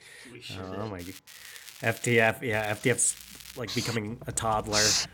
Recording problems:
household noises; loud; throughout; as loud as the speech
crackling; noticeable; at 1 s, from 1.5 to 2.5 s and from 2.5 to 3.5 s; 15 dB below the speech

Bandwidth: 17 kHz